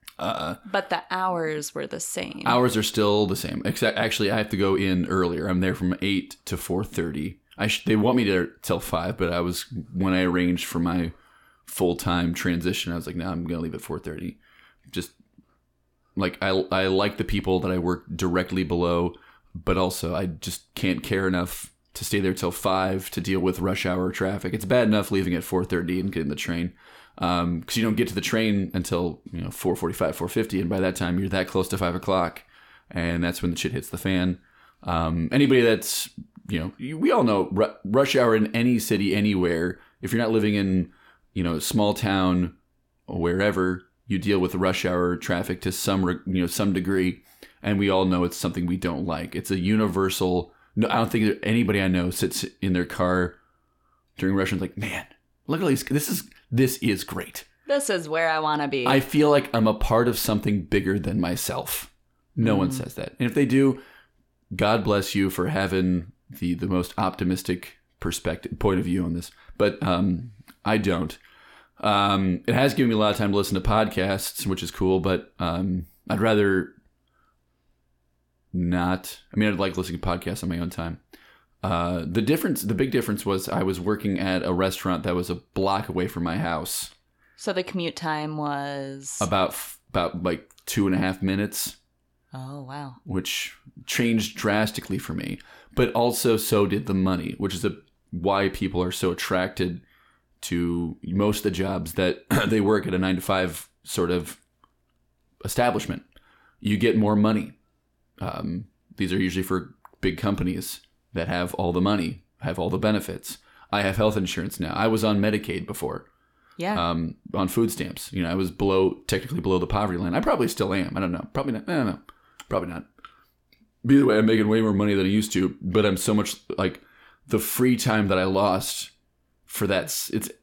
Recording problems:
none

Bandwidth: 17 kHz